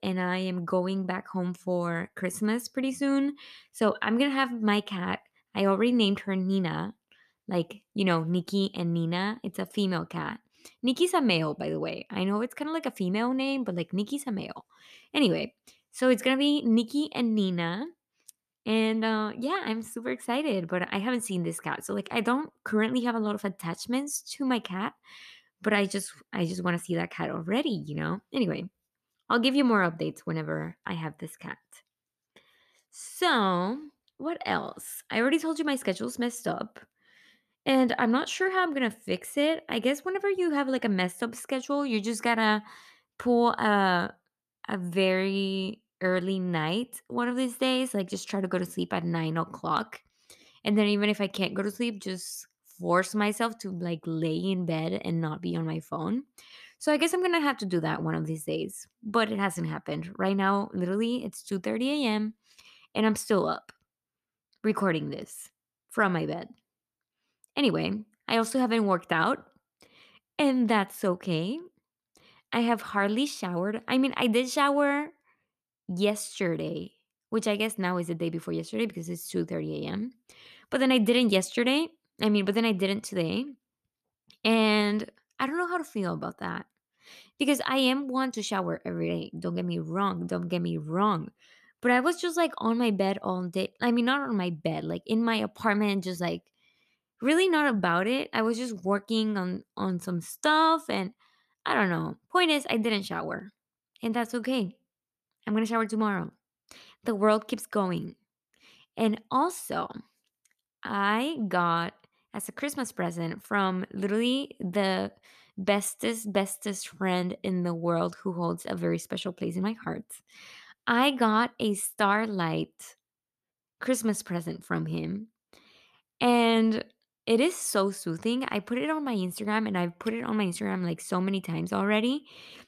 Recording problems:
none

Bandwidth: 14.5 kHz